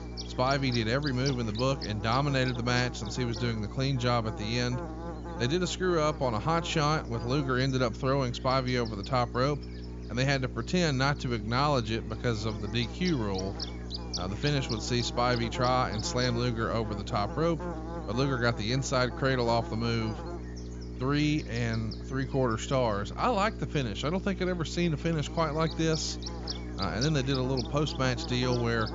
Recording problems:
high frequencies cut off; noticeable; nothing above 7 kHz
electrical hum; noticeable; throughout; 60 Hz, 10 dB below the speech

